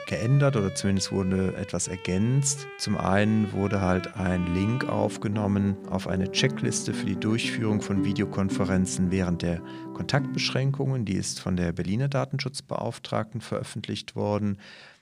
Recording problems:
background music; loud; throughout; 10 dB below the speech

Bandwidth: 15 kHz